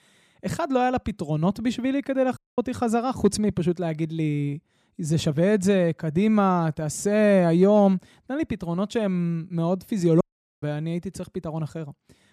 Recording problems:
audio cutting out; at 2.5 s and at 10 s

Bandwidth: 14.5 kHz